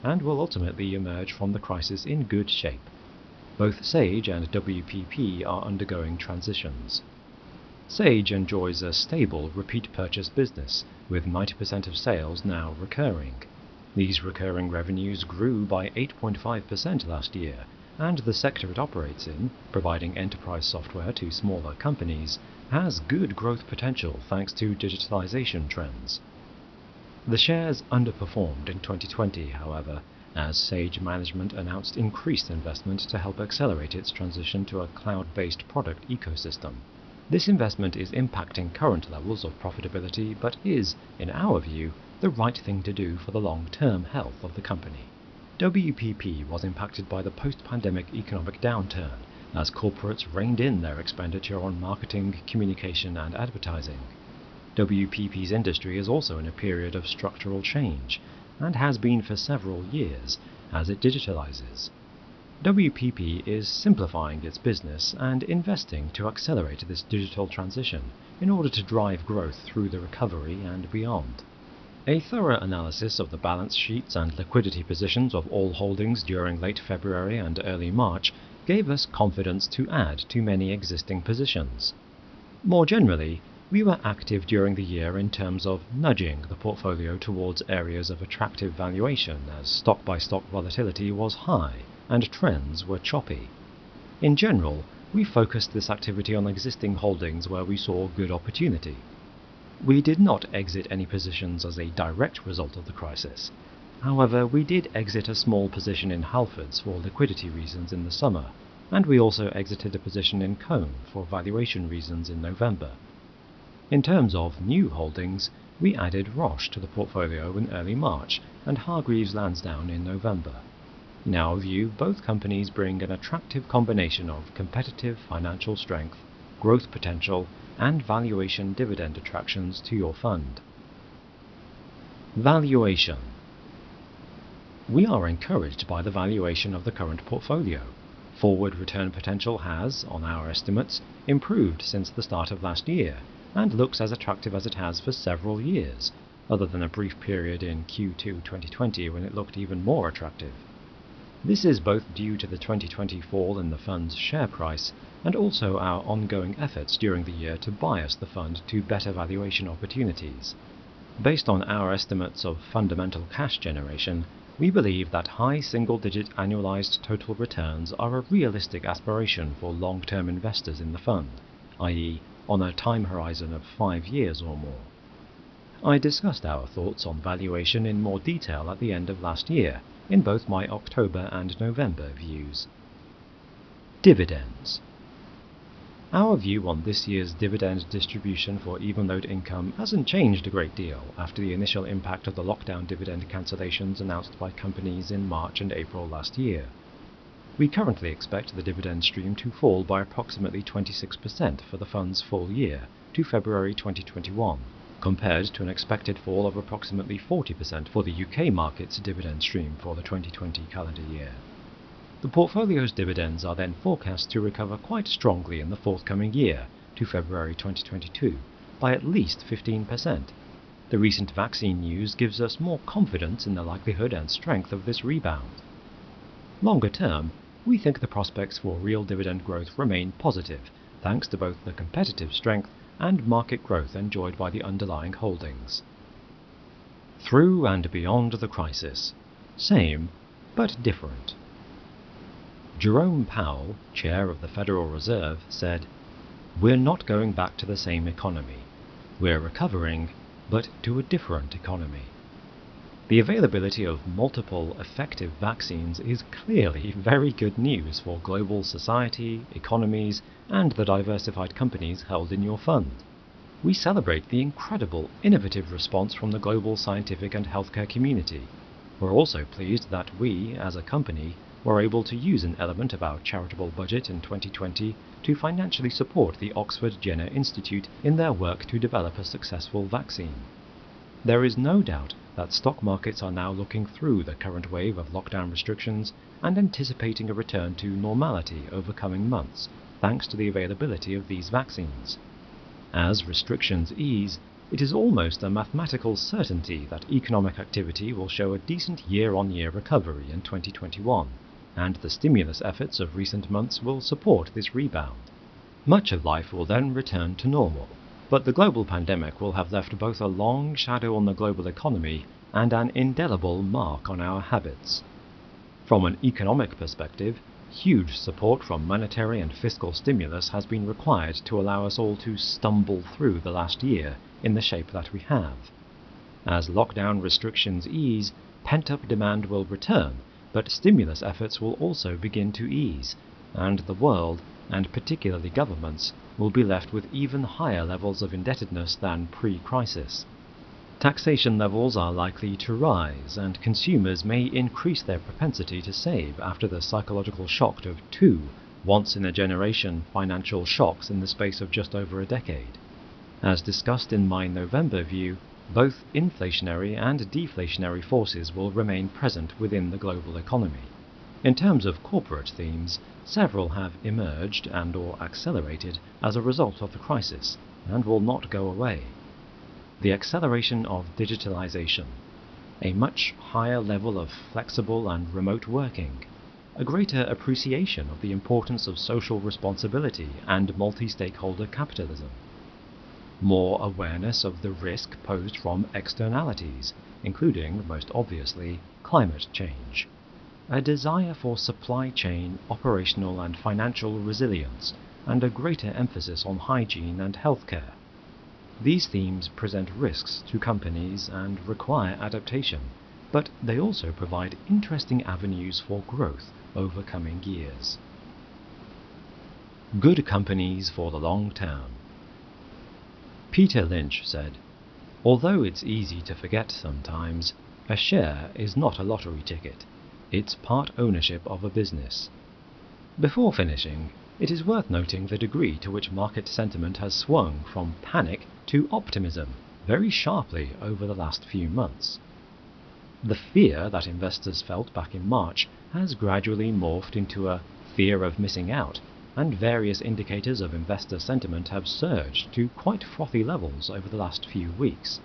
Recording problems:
high frequencies cut off; noticeable; nothing above 5.5 kHz
hiss; faint; throughout; 20 dB below the speech

